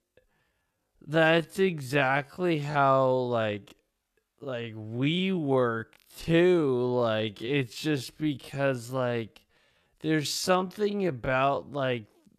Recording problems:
wrong speed, natural pitch; too slow; 0.5 times normal speed

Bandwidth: 14 kHz